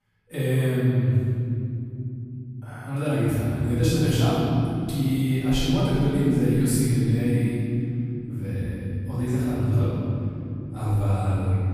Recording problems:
room echo; strong; dies away in 3 s
off-mic speech; far

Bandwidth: 15 kHz